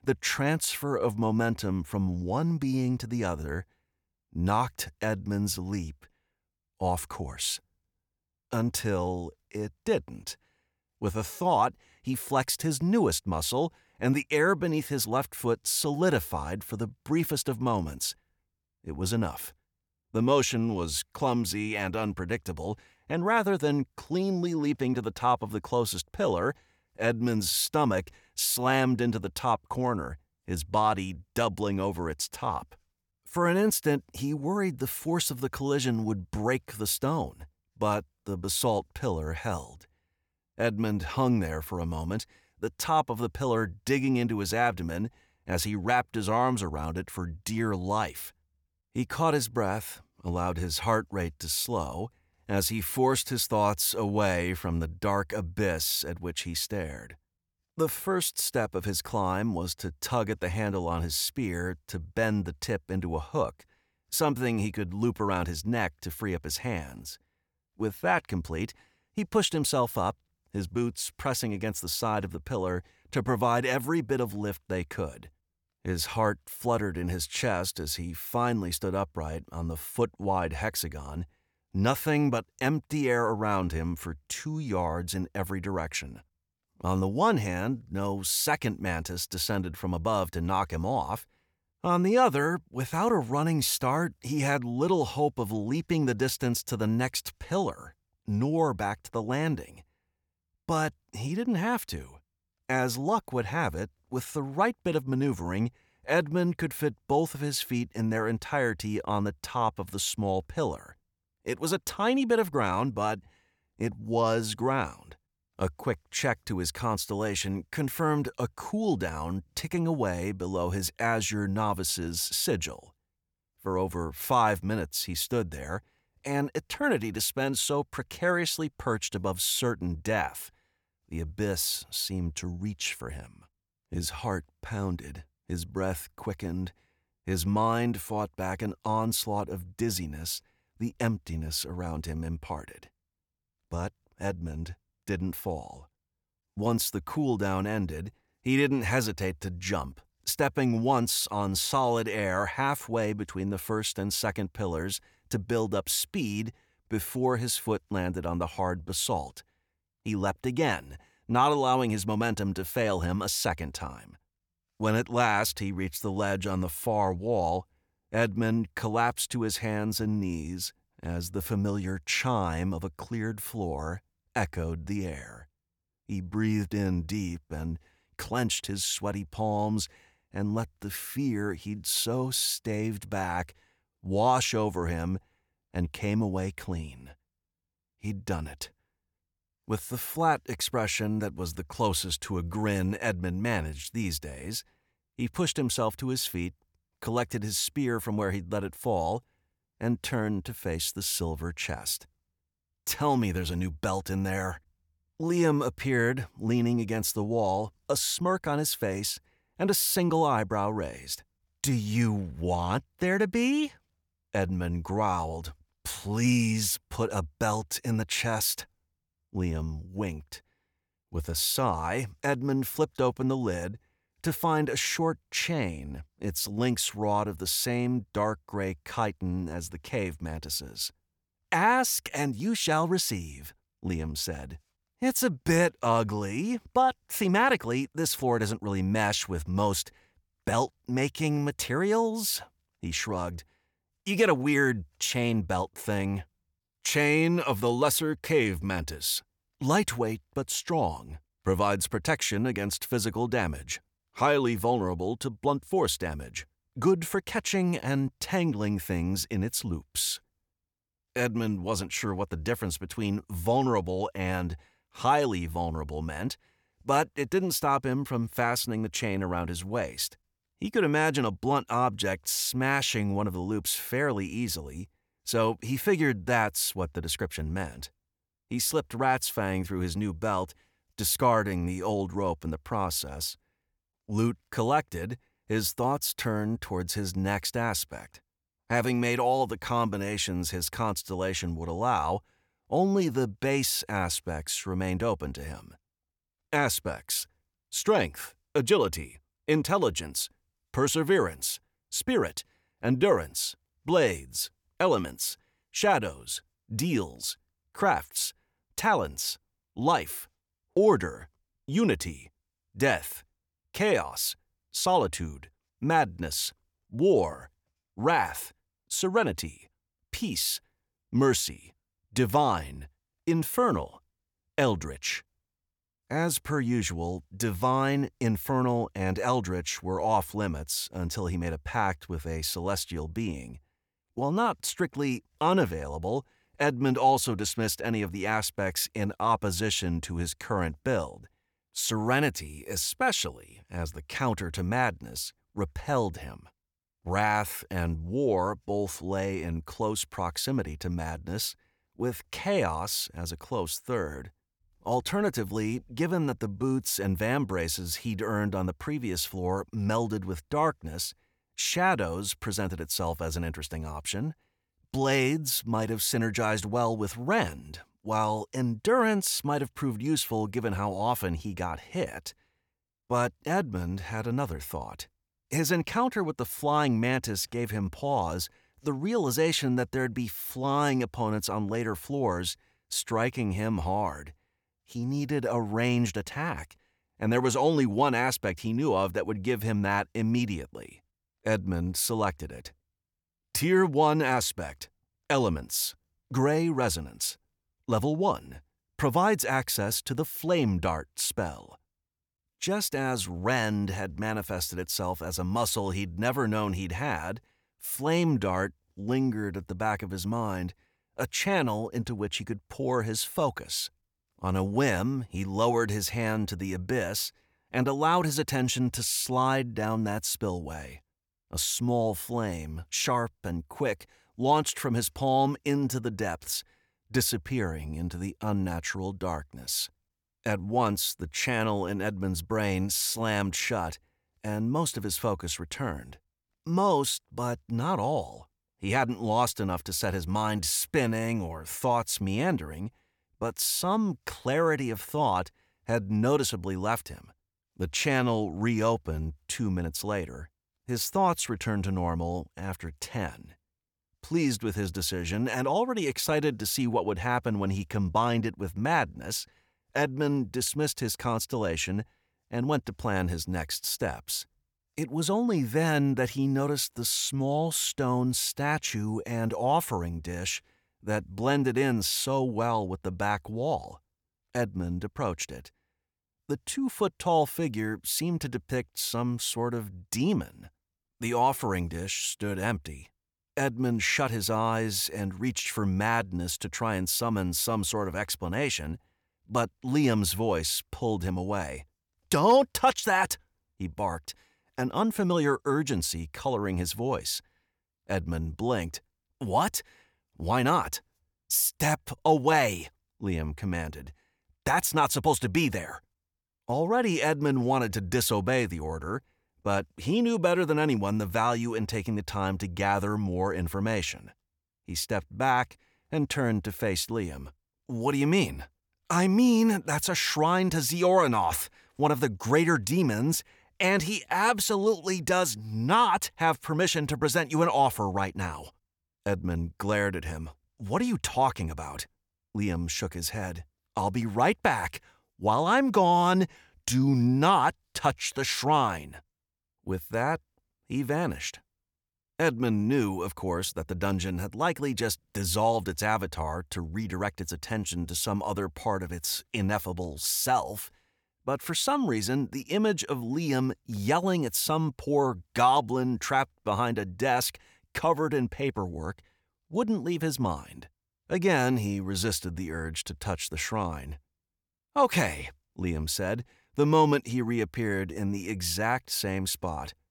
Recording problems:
none

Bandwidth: 18.5 kHz